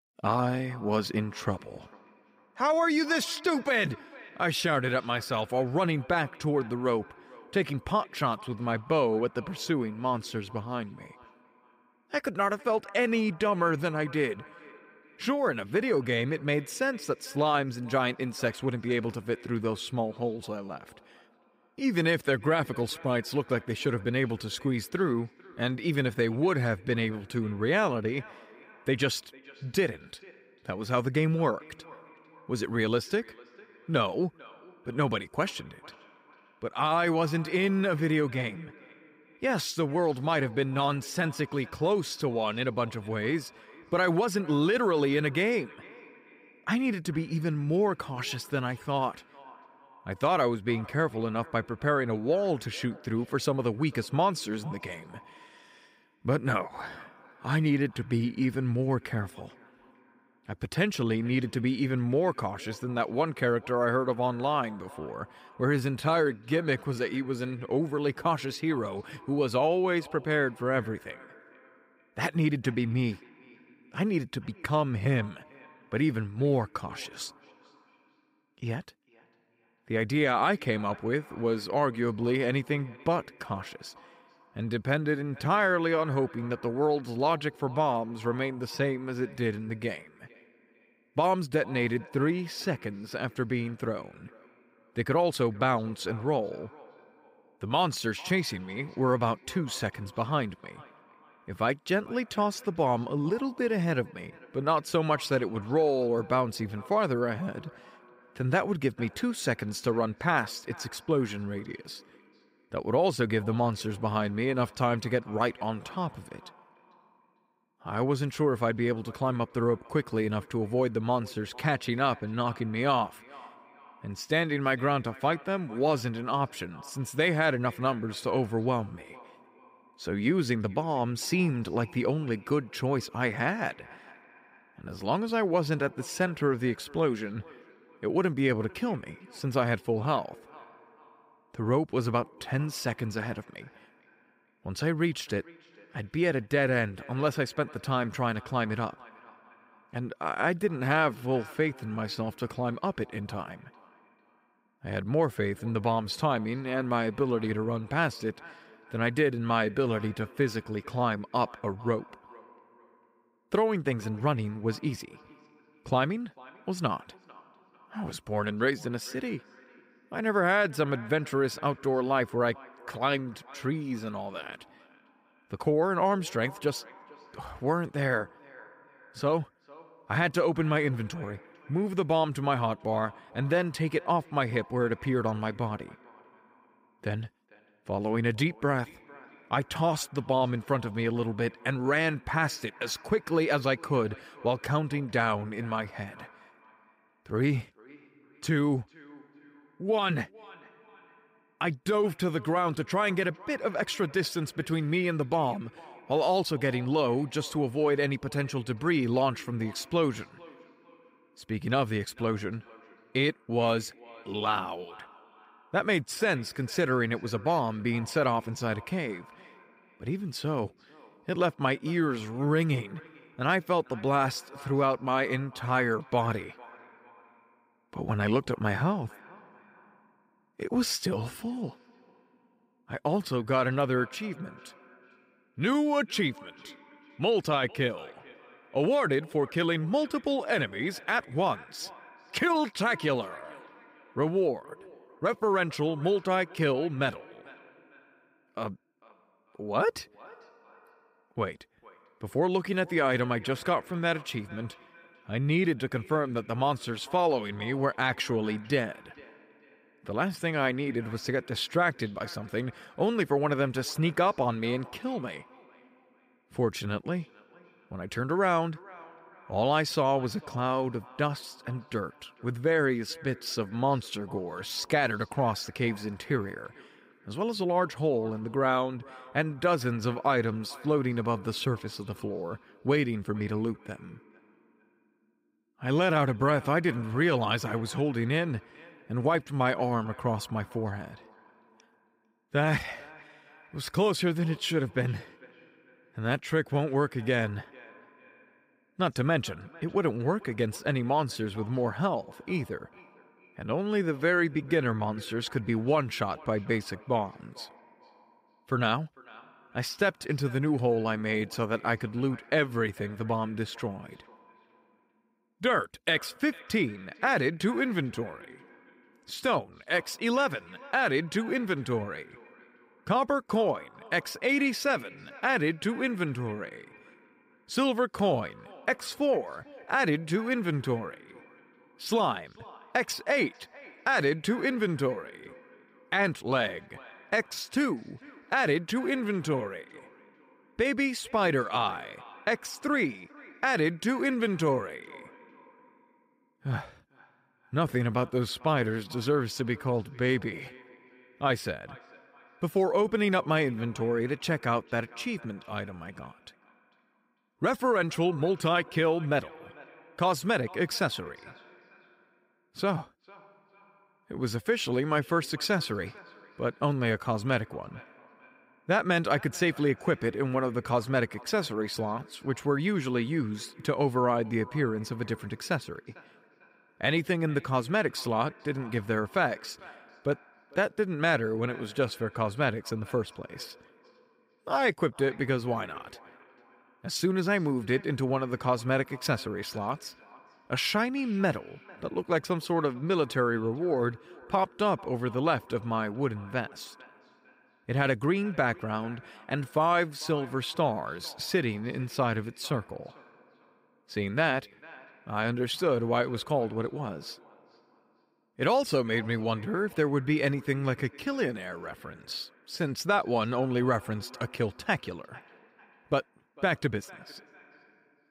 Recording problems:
echo of what is said; faint; throughout; 450 ms later, 25 dB below the speech

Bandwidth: 15.5 kHz